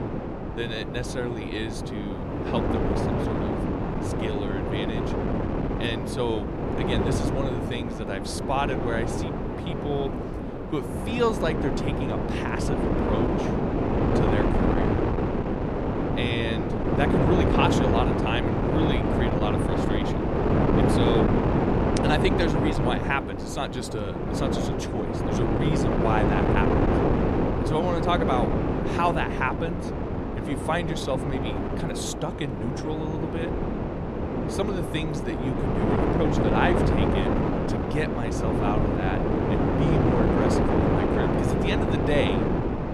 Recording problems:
wind noise on the microphone; heavy; 2 dB above the speech

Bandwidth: 14.5 kHz